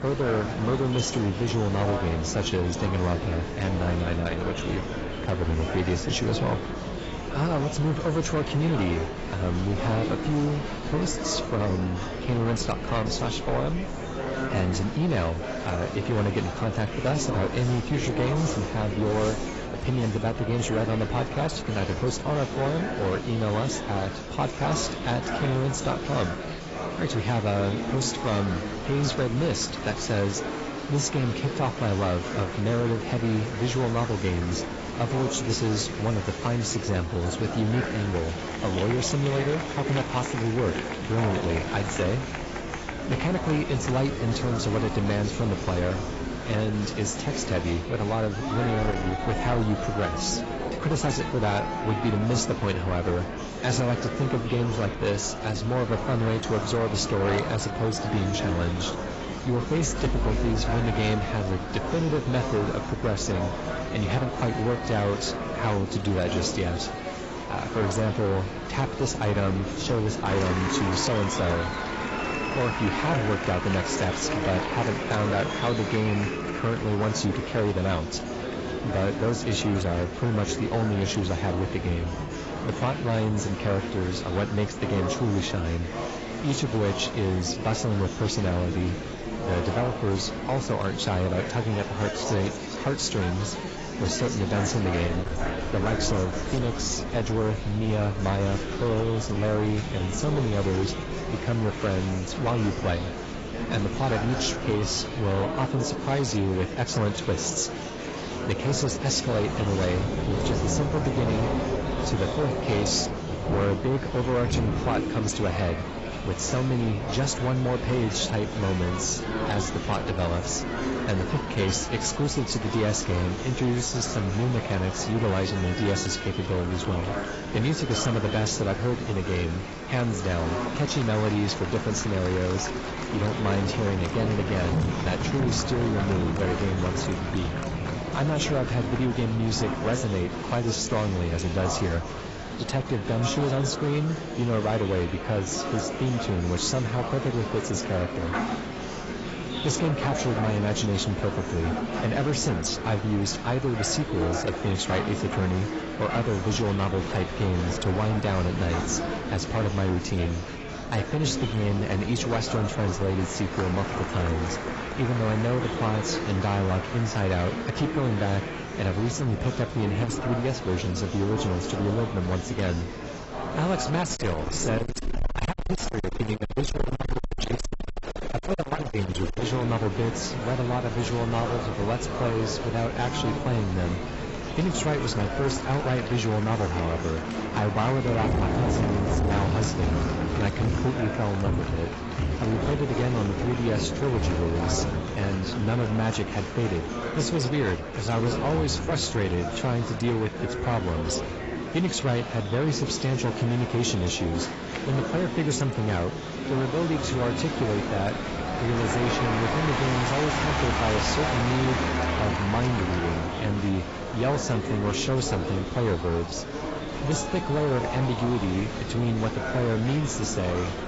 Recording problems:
garbled, watery; badly; nothing above 7.5 kHz
distortion; slight; 10% of the sound clipped
rain or running water; loud; throughout; 10 dB below the speech
murmuring crowd; loud; throughout; 6 dB below the speech
wind noise on the microphone; occasional gusts; 15 dB below the speech

